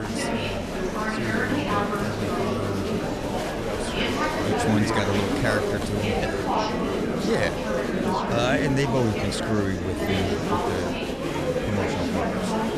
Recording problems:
murmuring crowd; very loud; throughout; 3 dB above the speech
abrupt cut into speech; at the start

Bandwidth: 13.5 kHz